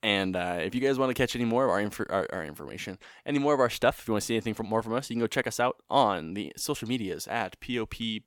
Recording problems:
none

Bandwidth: 18 kHz